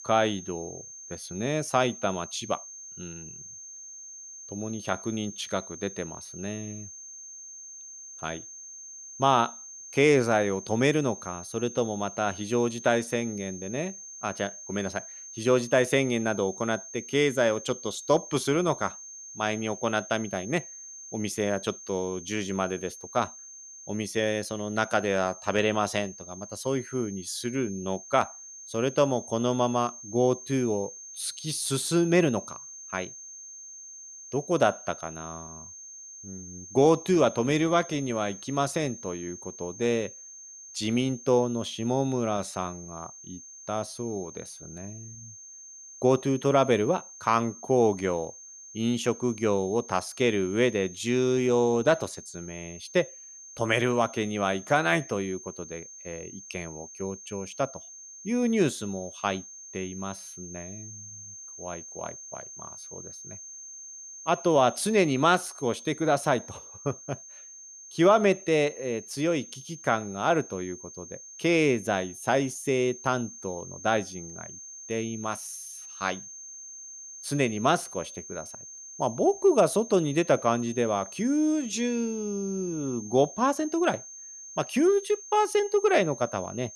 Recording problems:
high-pitched whine; noticeable; throughout; 6.5 kHz, 15 dB below the speech

